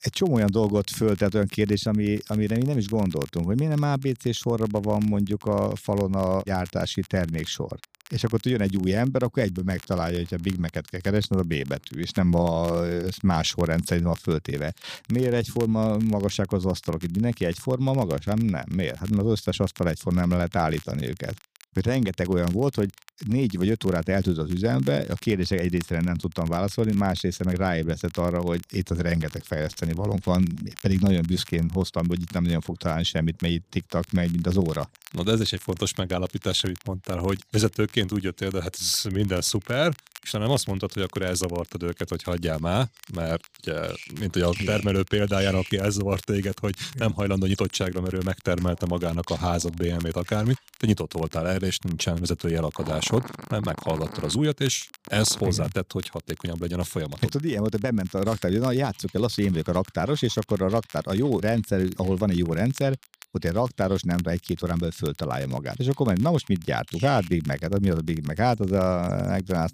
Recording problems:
animal sounds; noticeable; throughout; 20 dB below the speech
crackle, like an old record; faint; 20 dB below the speech

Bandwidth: 15 kHz